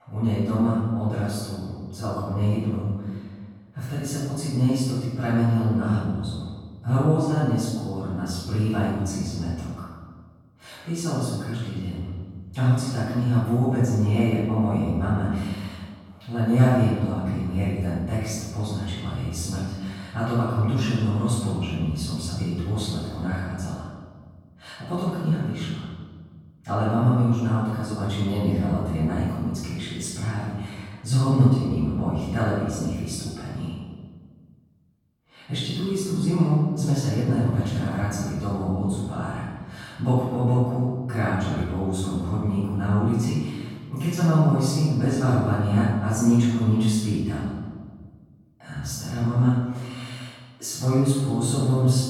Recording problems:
room echo; strong; dies away in 1.4 s
off-mic speech; far

